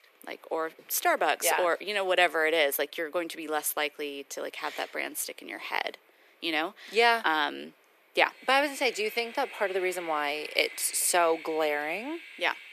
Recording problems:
thin; very; fading below 400 Hz
train or aircraft noise; noticeable; throughout; 15 dB below the speech

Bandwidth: 14.5 kHz